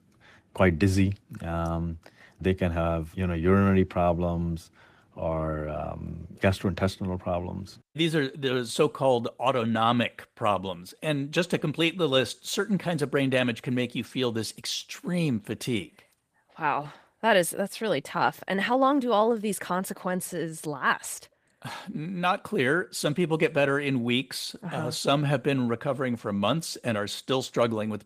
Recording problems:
garbled, watery; slightly; nothing above 15 kHz

